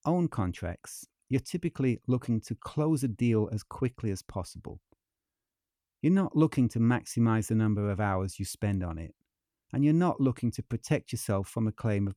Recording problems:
none

